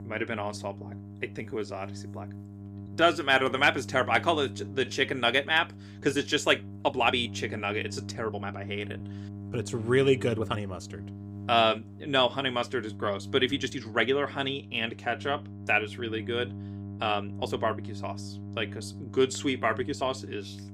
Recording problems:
electrical hum; faint; throughout; 50 Hz, 20 dB below the speech
uneven, jittery; strongly; from 1.5 to 20 s

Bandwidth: 15.5 kHz